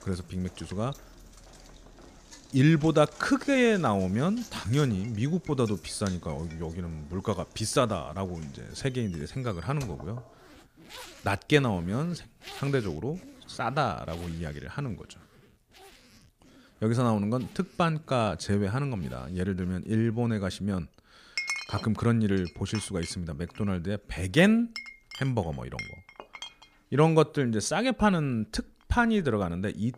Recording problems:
household noises; noticeable; throughout; 15 dB below the speech

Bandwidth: 15 kHz